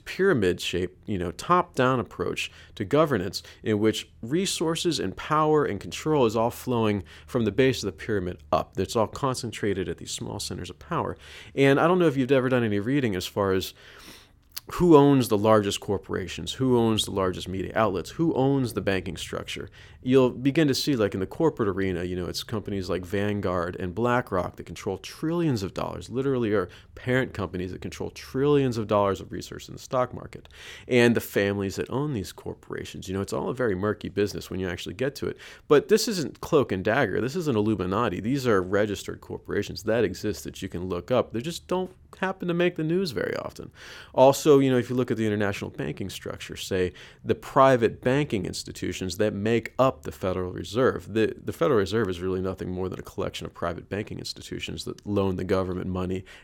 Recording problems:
none

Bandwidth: 17 kHz